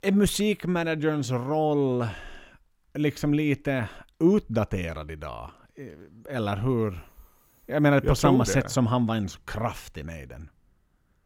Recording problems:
none

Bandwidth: 16.5 kHz